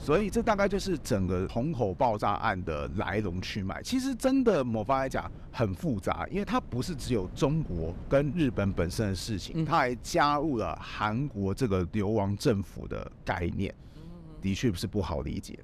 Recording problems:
wind noise on the microphone; occasional gusts; 25 dB below the speech

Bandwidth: 14.5 kHz